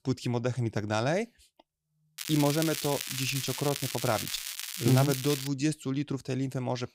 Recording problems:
crackling; loud; from 2 to 5.5 s; 5 dB below the speech

